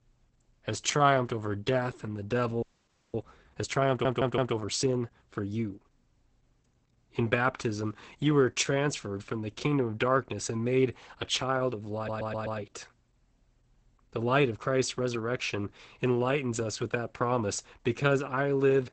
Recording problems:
garbled, watery; badly; nothing above 8 kHz
audio freezing; at 2.5 s for 0.5 s
audio stuttering; at 4 s and at 12 s

